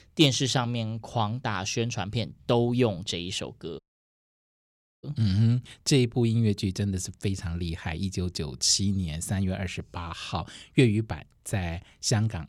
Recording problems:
audio cutting out; at 4 s for 1 s

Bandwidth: 18.5 kHz